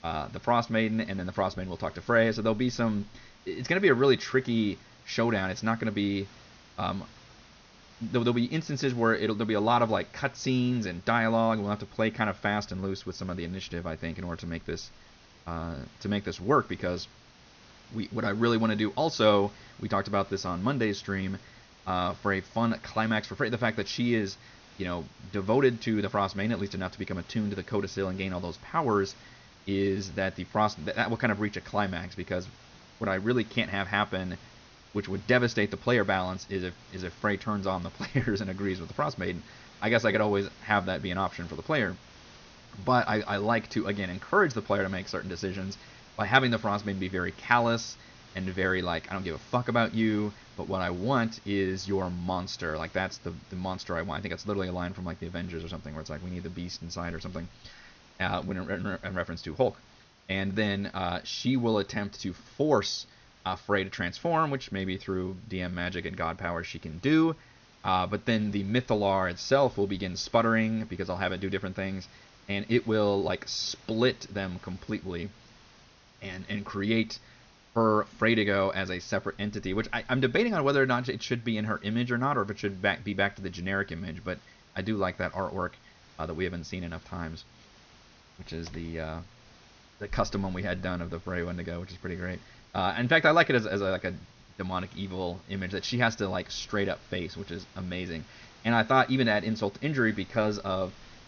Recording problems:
high frequencies cut off; noticeable; nothing above 6.5 kHz
hiss; faint; throughout; 25 dB below the speech

